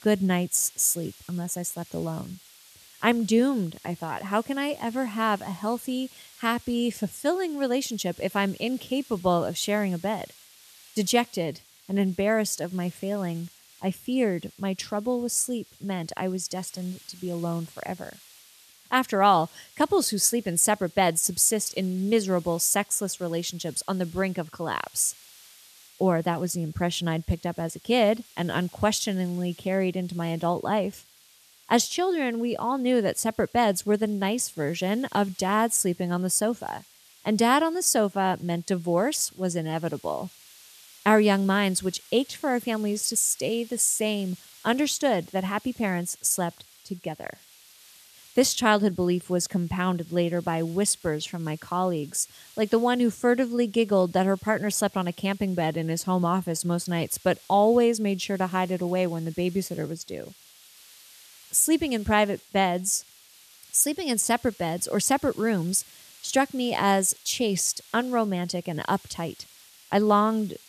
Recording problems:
hiss; faint; throughout; 25 dB below the speech

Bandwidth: 14 kHz